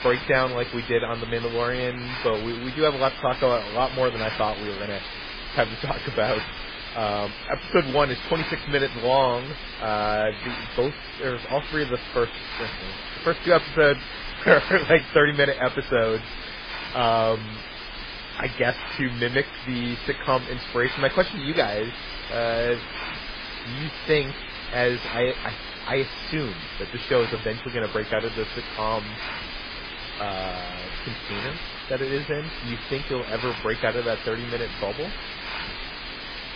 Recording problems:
garbled, watery; badly; nothing above 5 kHz
hiss; loud; throughout; 8 dB below the speech

